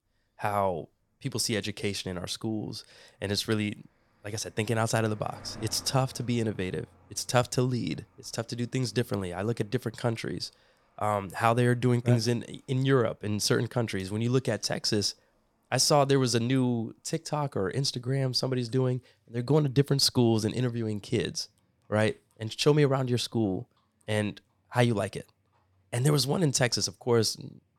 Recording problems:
animal sounds; faint; throughout; 30 dB below the speech

